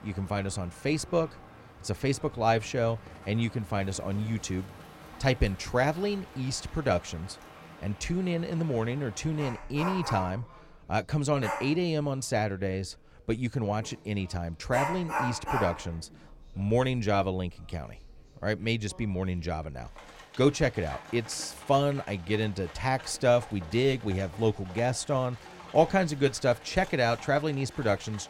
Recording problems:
animal sounds; noticeable; throughout; 10 dB below the speech
voice in the background; faint; throughout; 30 dB below the speech

